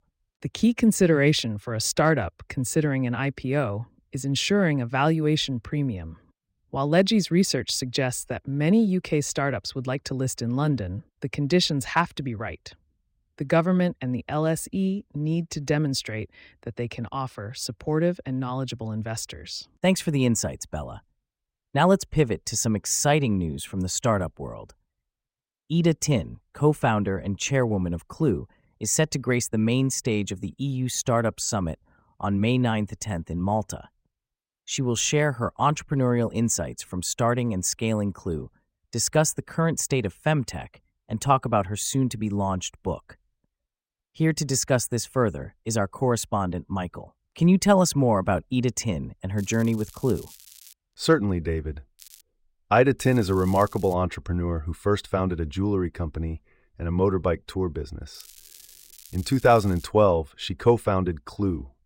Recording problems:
crackling; faint; 4 times, first at 49 s; 20 dB below the speech

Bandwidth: 16 kHz